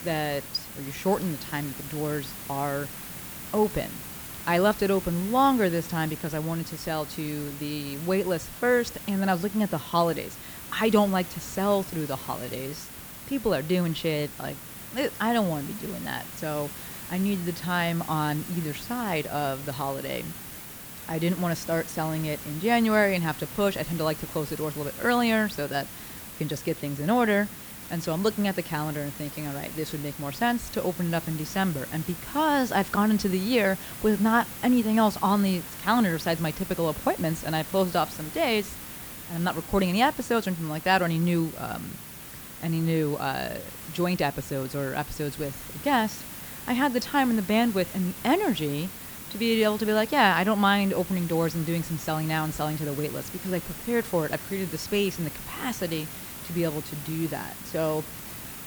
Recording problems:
hiss; noticeable; throughout; 10 dB below the speech

